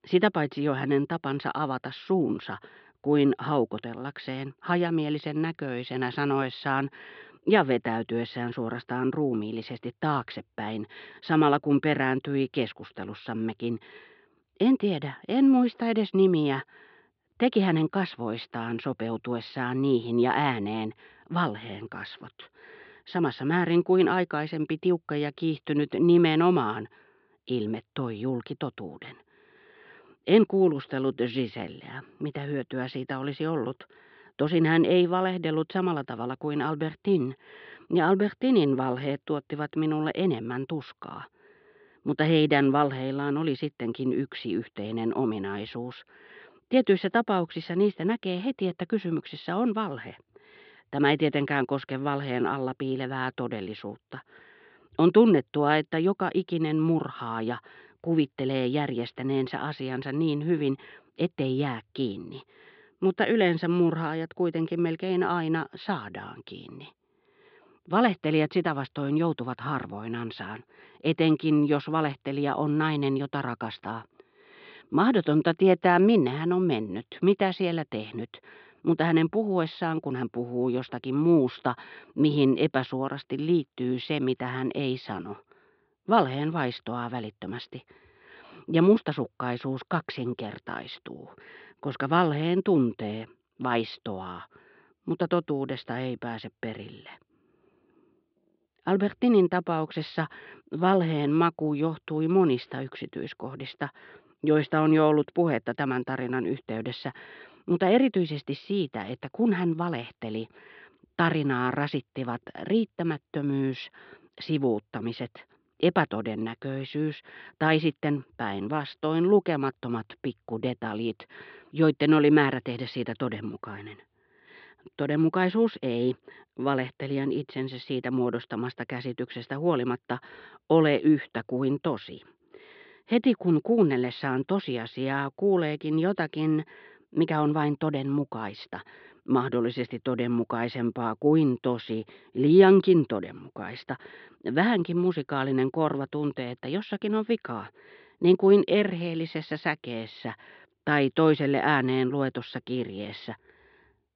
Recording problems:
muffled; slightly; fading above 3.5 kHz
high frequencies cut off; noticeable; nothing above 5.5 kHz

